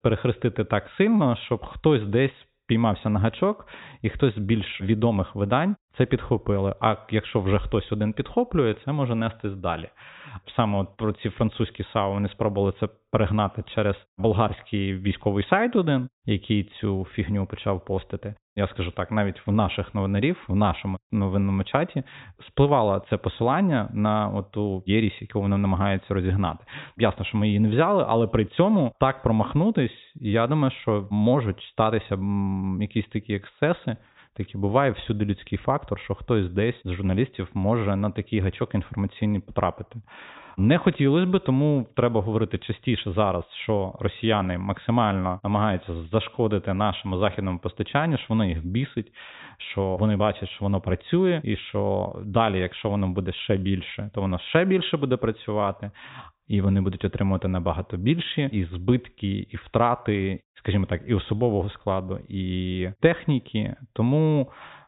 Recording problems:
high frequencies cut off; severe; nothing above 4 kHz

